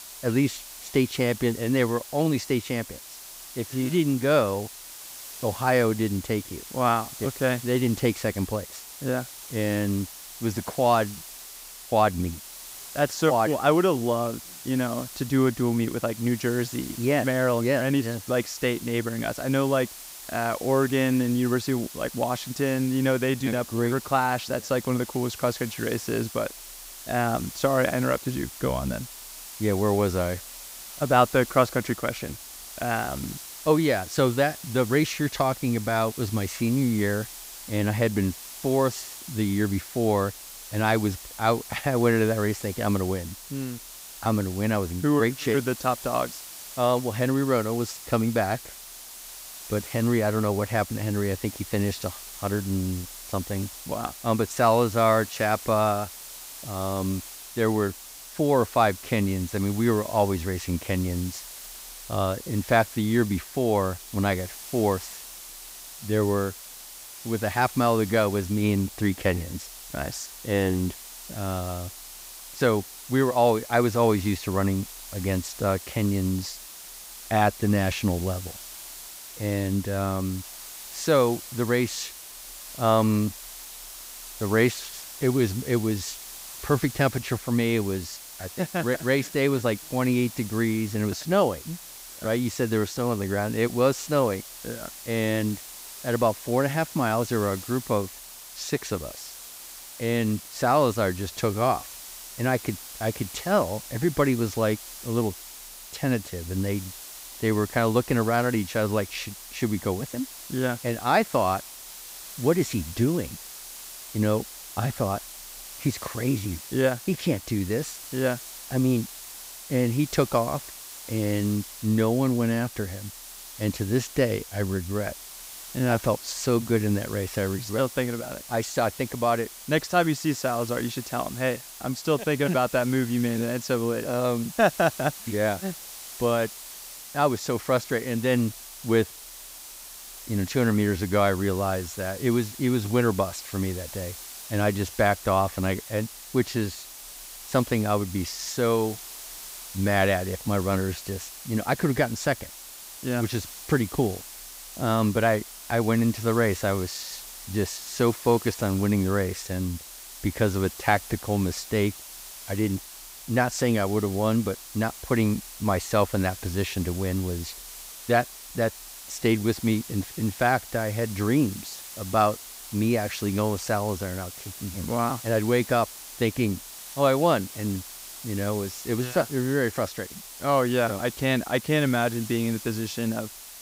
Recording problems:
hiss; noticeable; throughout; 15 dB below the speech

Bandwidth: 15.5 kHz